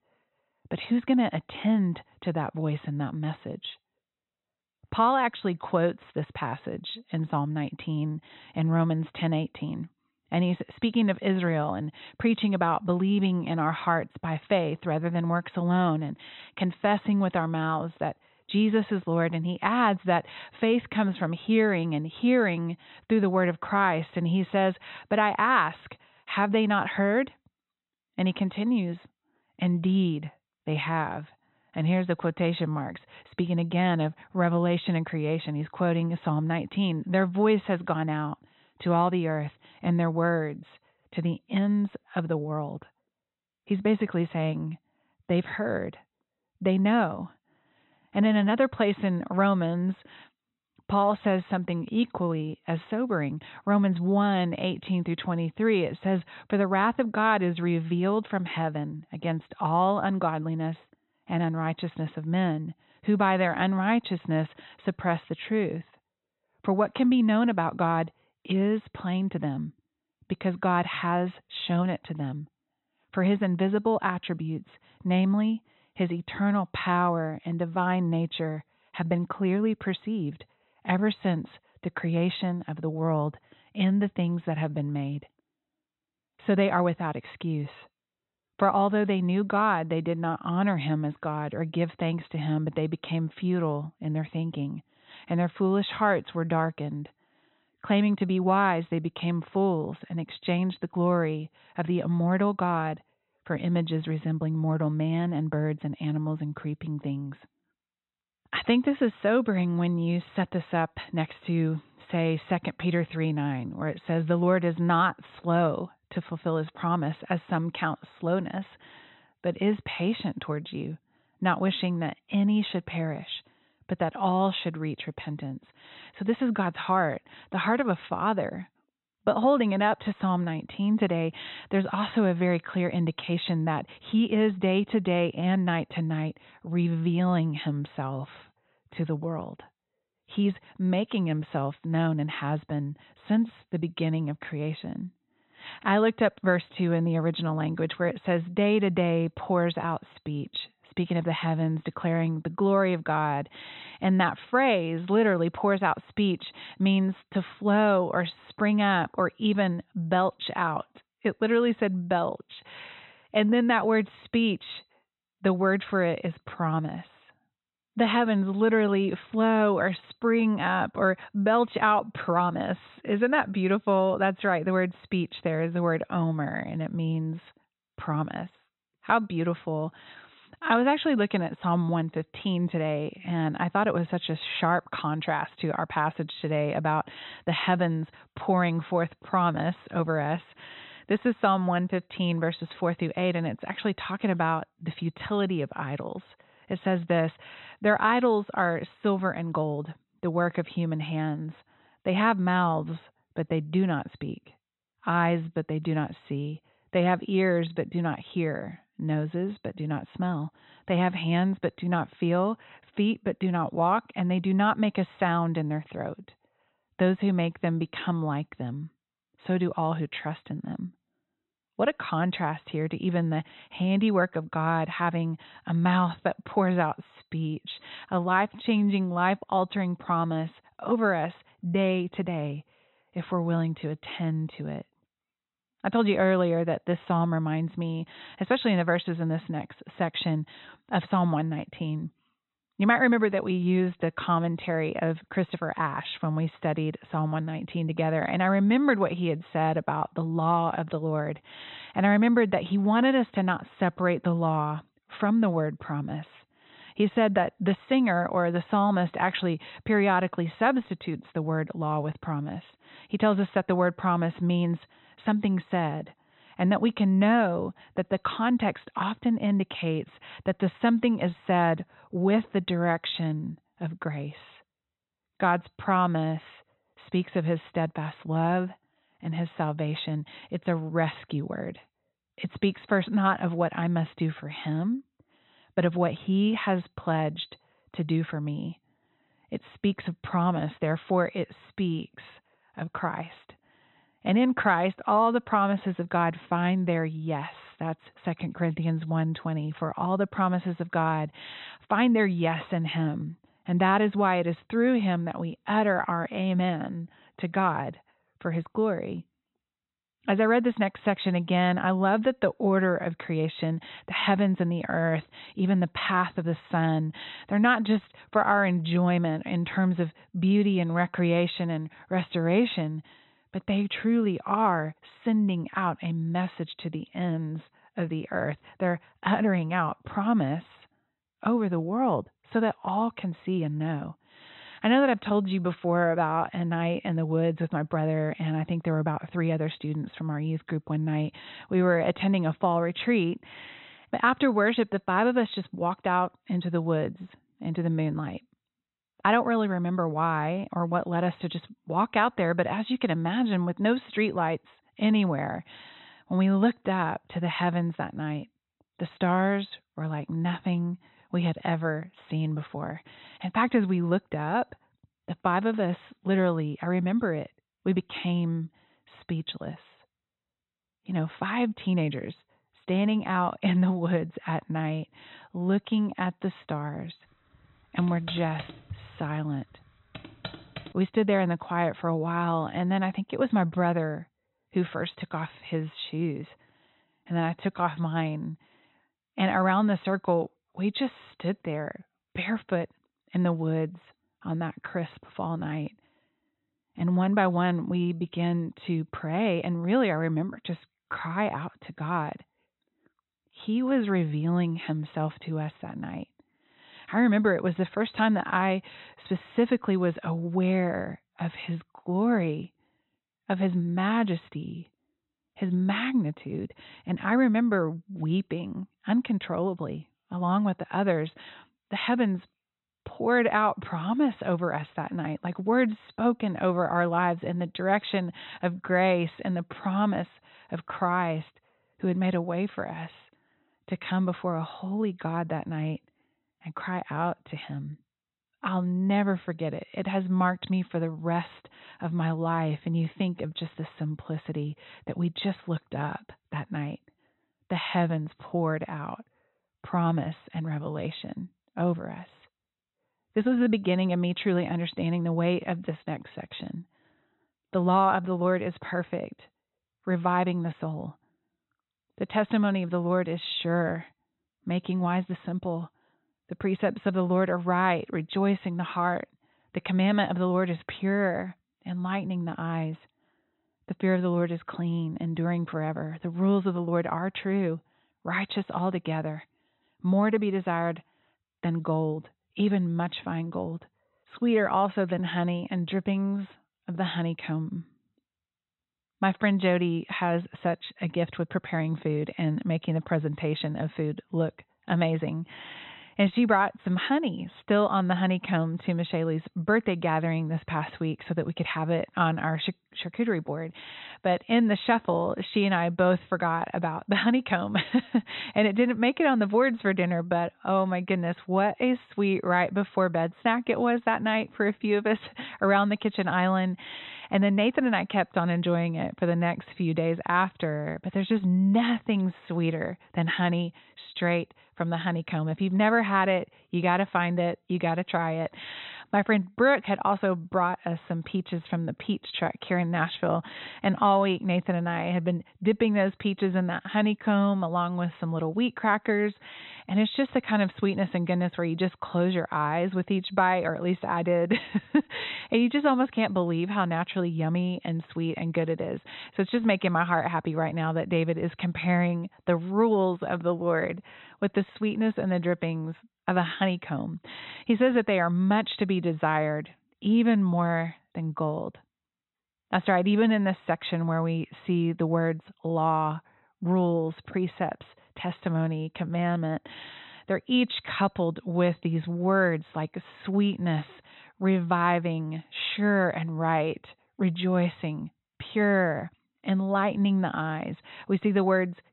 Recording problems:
high frequencies cut off; severe; nothing above 4 kHz
keyboard typing; faint; from 6:18 to 6:21; peak 15 dB below the speech

